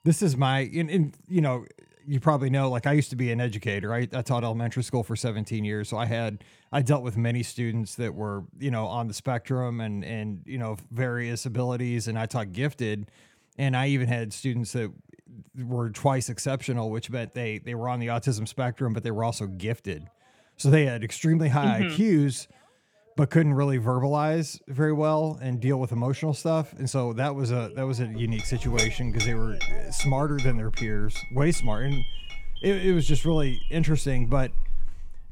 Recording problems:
alarms or sirens; faint; throughout; 20 dB below the speech
clattering dishes; loud; from 28 s on; peak level with the speech

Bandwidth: 18 kHz